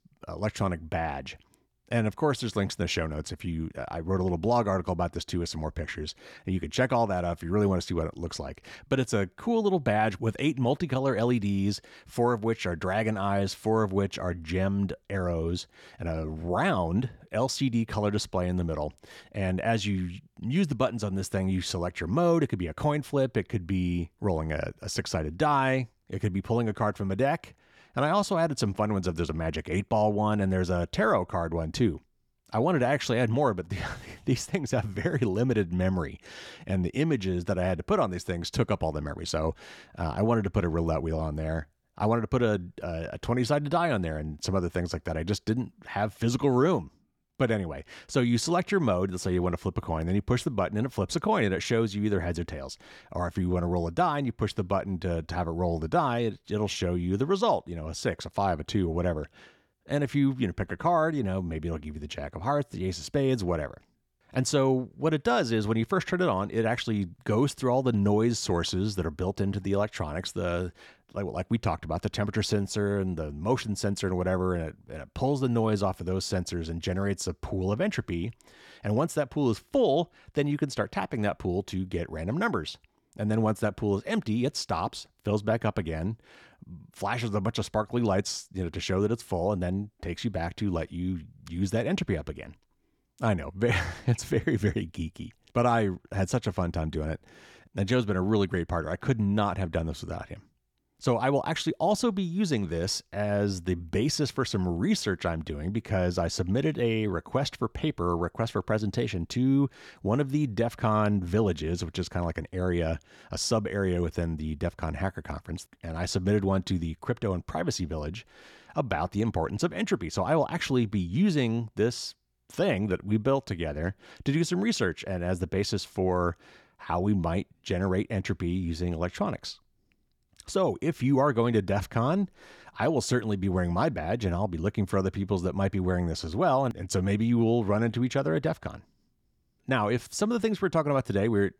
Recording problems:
none

